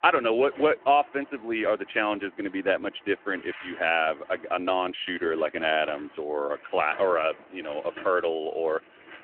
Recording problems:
phone-call audio
traffic noise; faint; throughout; 20 dB below the speech

